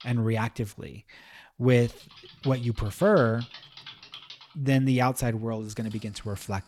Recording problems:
household noises; noticeable; throughout; 20 dB below the speech

